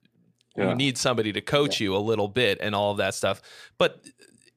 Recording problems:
none

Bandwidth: 15 kHz